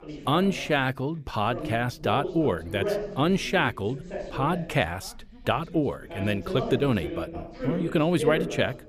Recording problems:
background chatter; loud; throughout; 3 voices, 8 dB below the speech

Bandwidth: 15 kHz